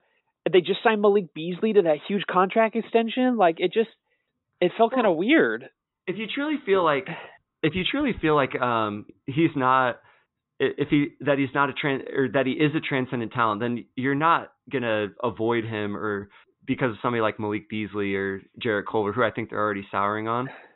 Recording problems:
high frequencies cut off; severe; nothing above 4 kHz

